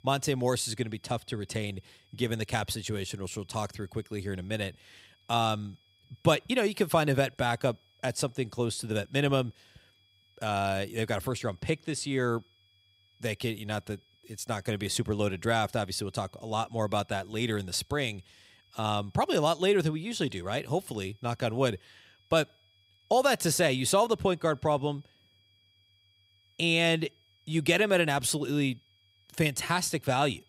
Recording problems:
high-pitched whine; faint; throughout; 3.5 kHz, 35 dB below the speech

